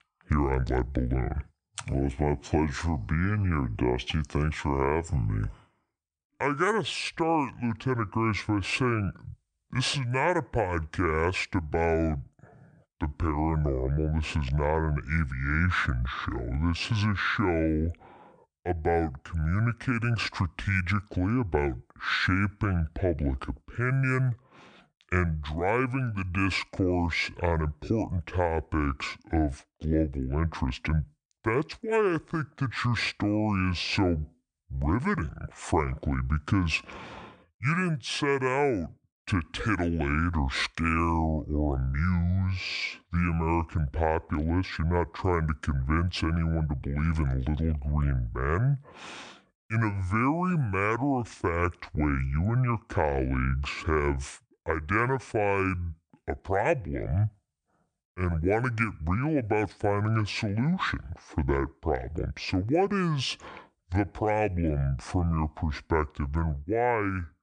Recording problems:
wrong speed and pitch; too slow and too low; 0.6 times normal speed

